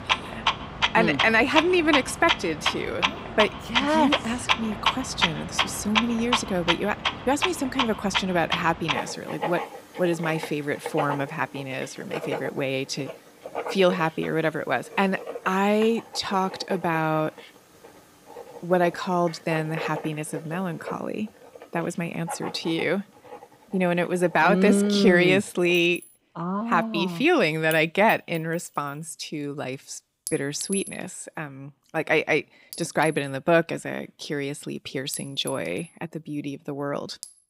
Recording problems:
household noises; loud; throughout; 4 dB below the speech

